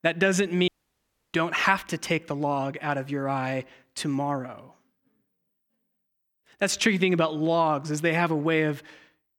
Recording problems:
audio cutting out; at 0.5 s for 0.5 s

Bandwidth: 18.5 kHz